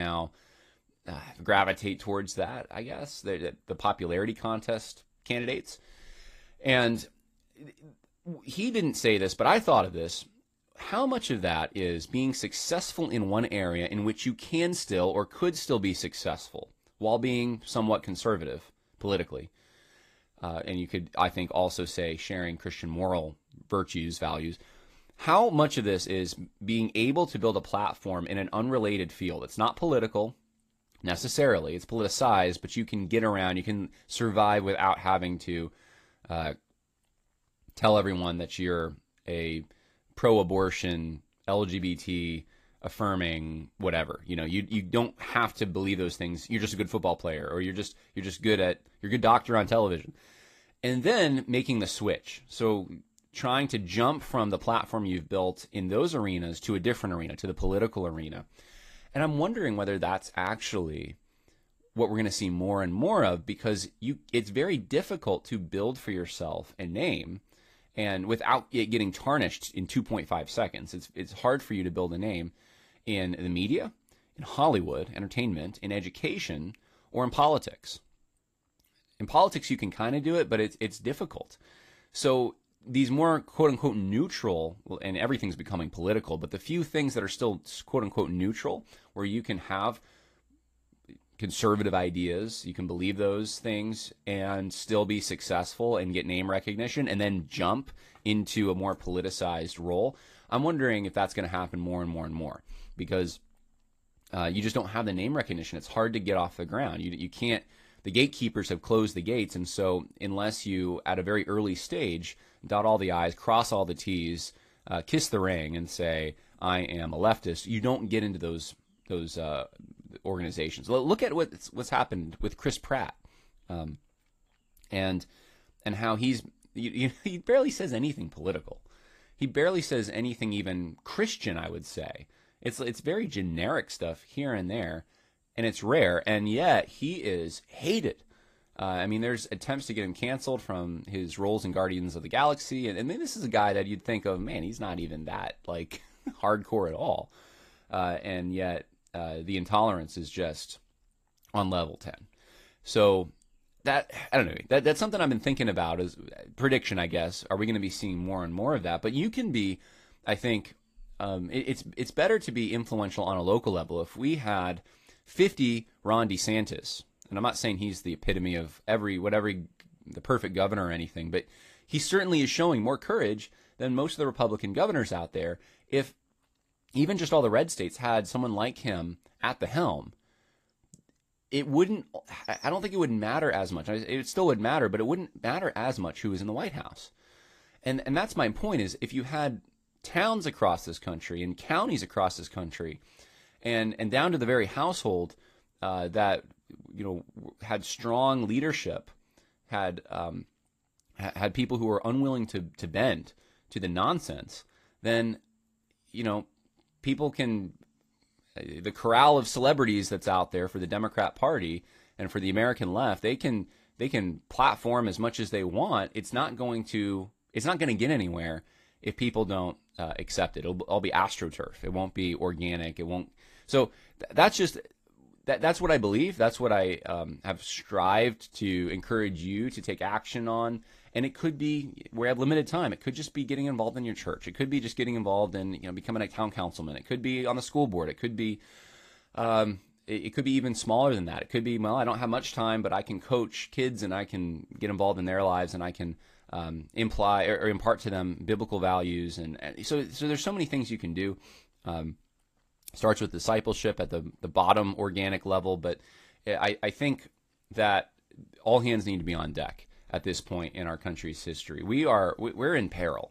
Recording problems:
garbled, watery; slightly; nothing above 15 kHz
abrupt cut into speech; at the start

